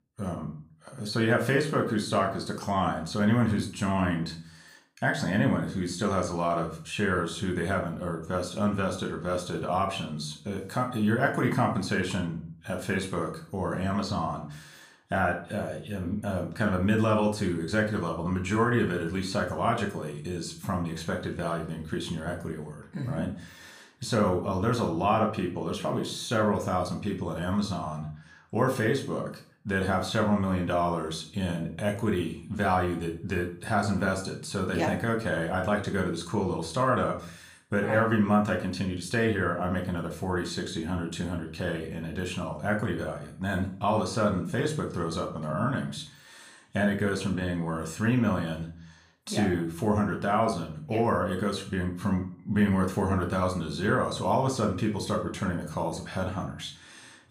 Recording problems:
room echo; slight; dies away in 0.4 s
off-mic speech; somewhat distant

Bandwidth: 15 kHz